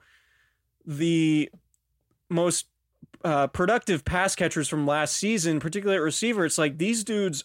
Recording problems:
none

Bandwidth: 16 kHz